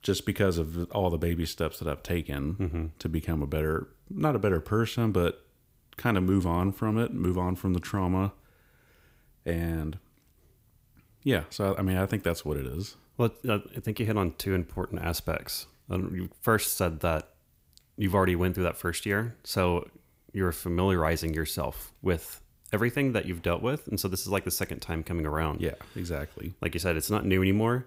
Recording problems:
none

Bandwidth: 15.5 kHz